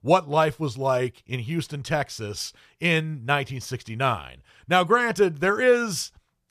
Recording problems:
none

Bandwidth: 14.5 kHz